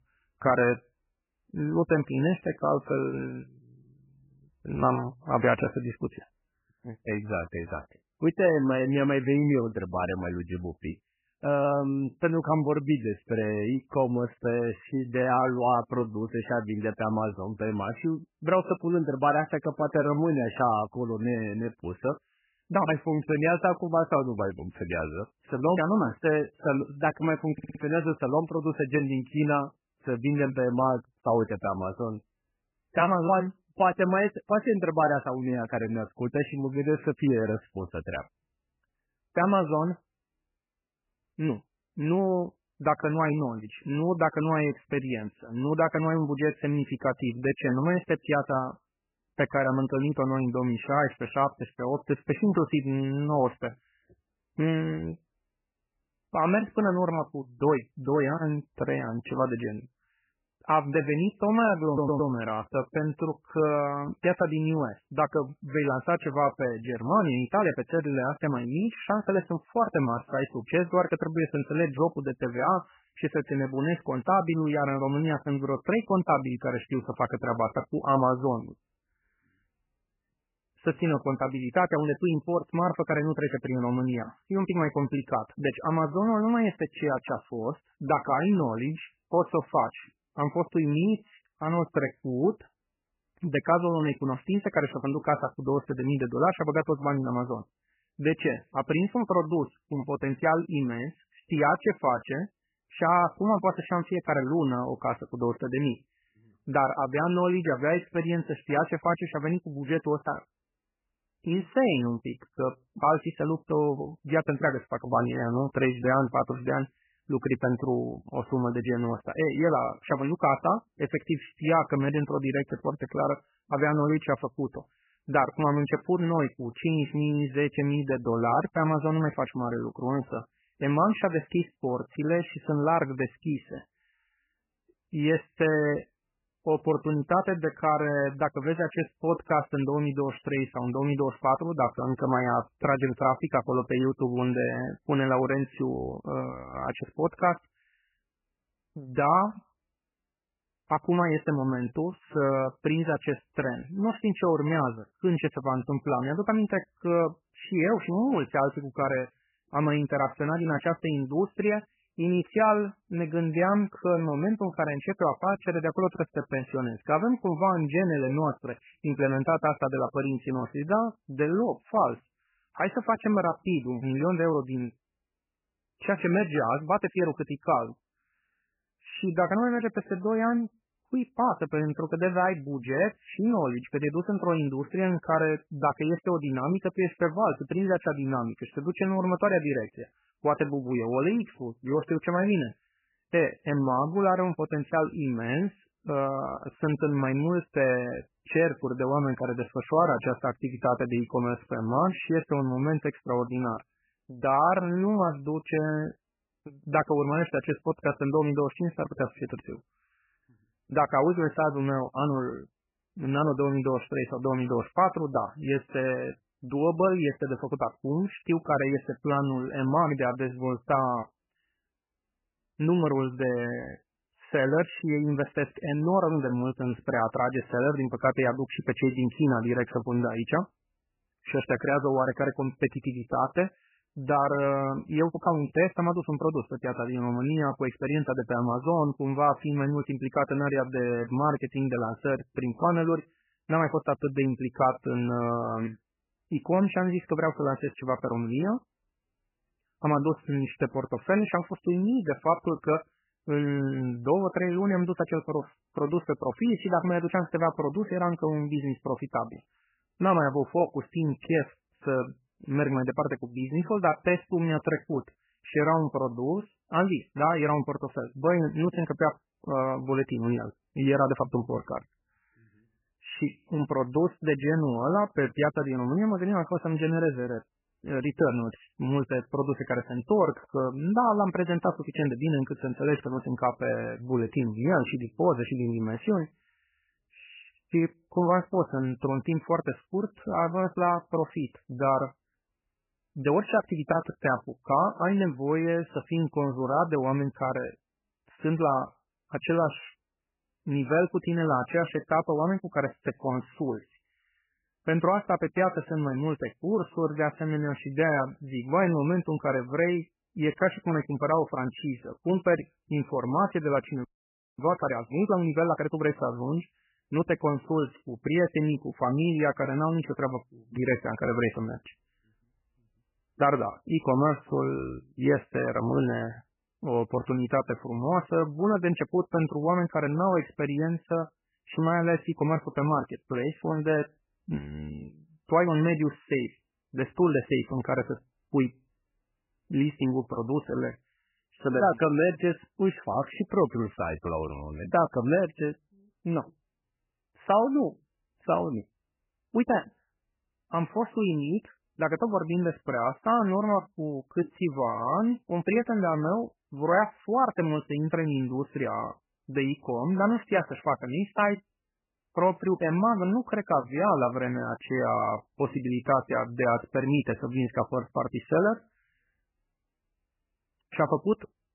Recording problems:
garbled, watery; badly; nothing above 3 kHz
audio stuttering; at 28 s and at 1:02
audio freezing; at 5:14 for 0.5 s

